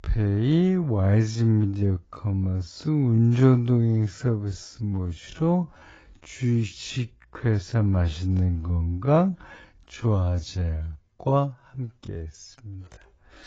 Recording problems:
garbled, watery; badly; nothing above 7.5 kHz
wrong speed, natural pitch; too slow; 0.5 times normal speed

